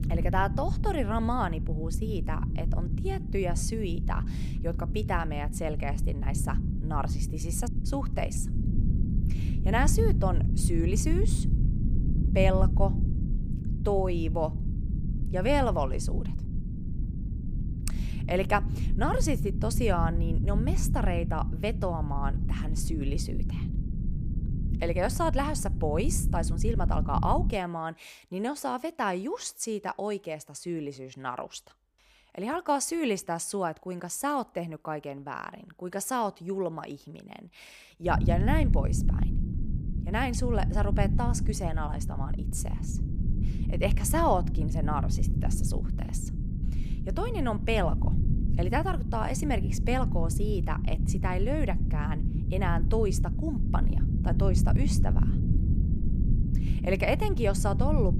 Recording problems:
low rumble; noticeable; until 28 s and from 38 s on; 10 dB below the speech

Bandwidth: 15 kHz